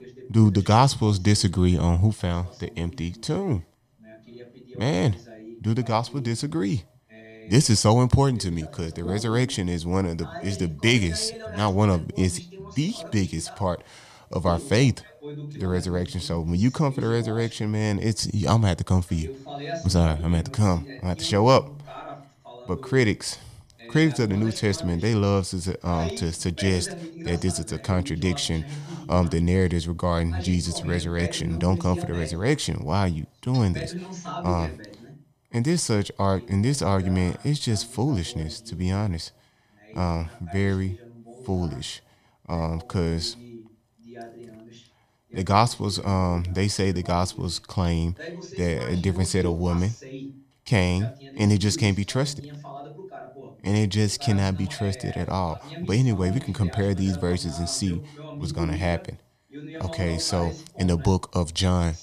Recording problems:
voice in the background; noticeable; throughout; 15 dB below the speech

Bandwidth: 14.5 kHz